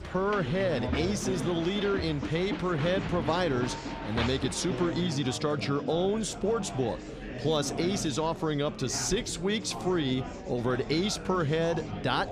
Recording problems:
murmuring crowd; loud; throughout; 7 dB below the speech

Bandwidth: 15 kHz